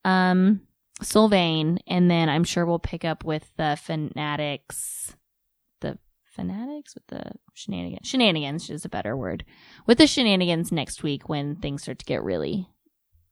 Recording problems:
none

